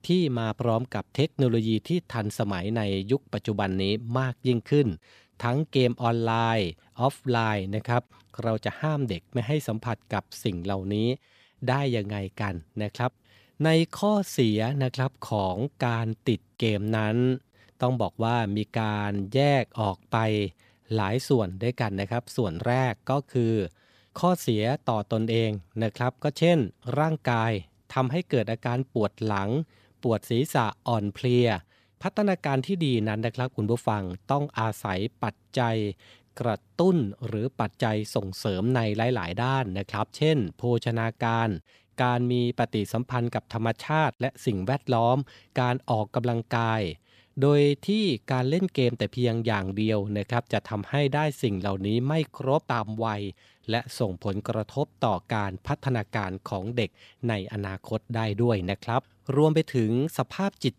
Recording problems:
none

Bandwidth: 14.5 kHz